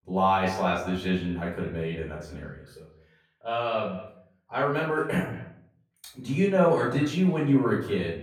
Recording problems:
off-mic speech; far
echo of what is said; noticeable; throughout; 200 ms later, 15 dB below the speech
room echo; noticeable; dies away in 0.5 s

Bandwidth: 18.5 kHz